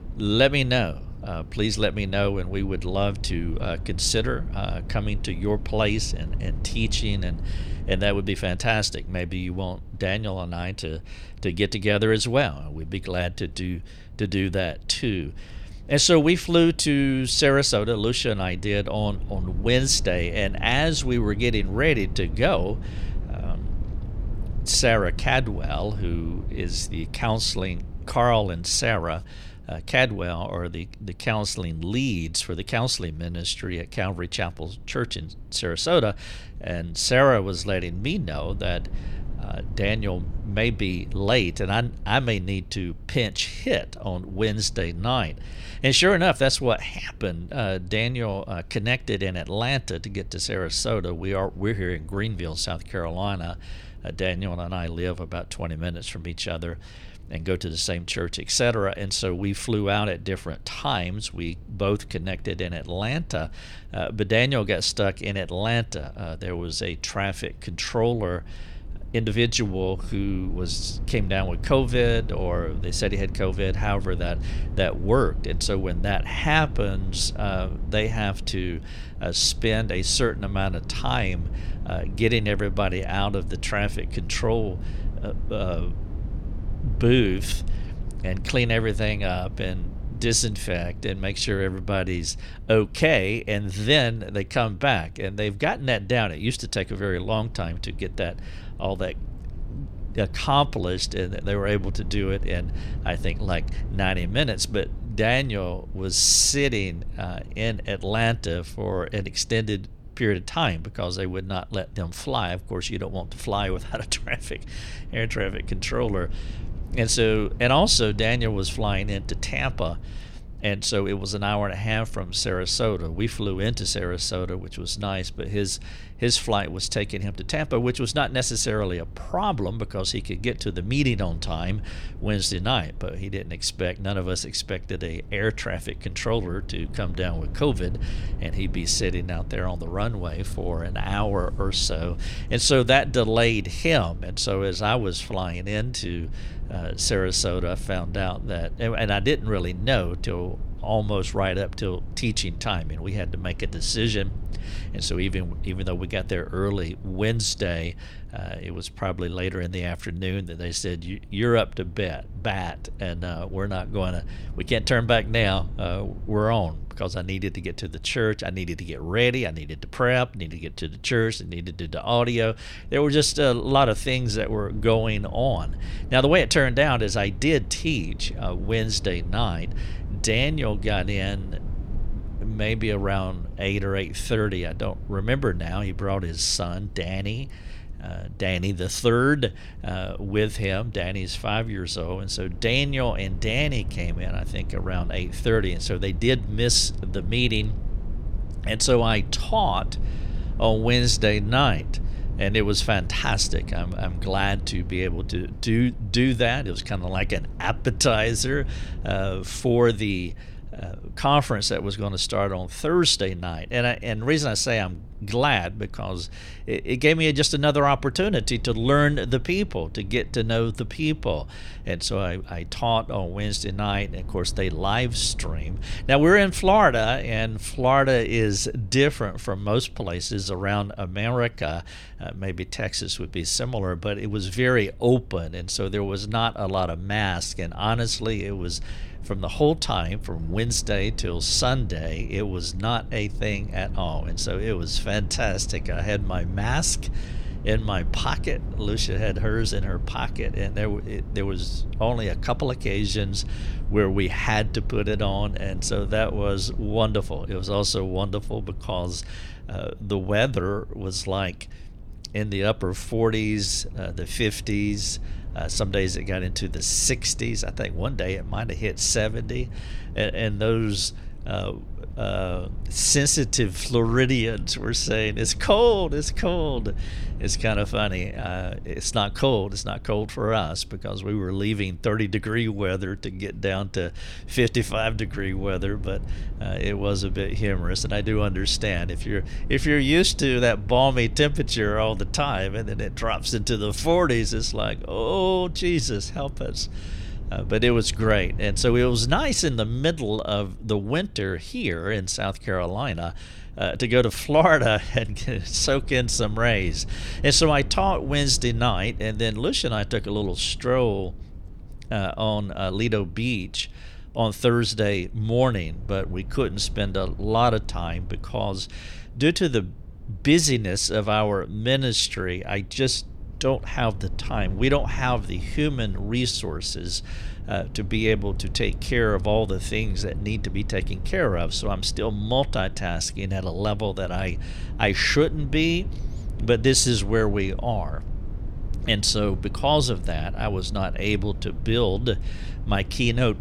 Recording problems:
low rumble; faint; throughout; 25 dB below the speech

